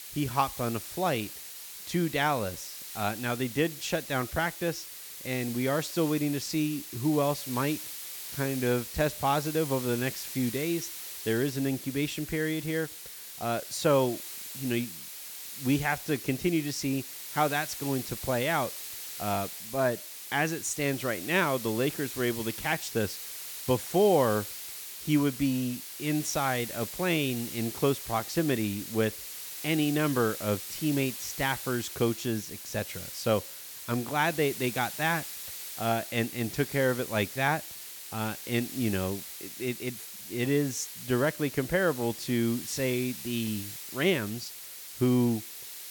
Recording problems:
hiss; loud; throughout; 8 dB below the speech

